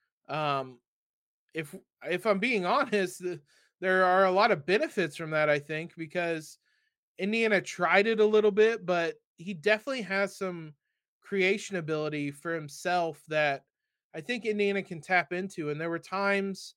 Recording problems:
none

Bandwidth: 16.5 kHz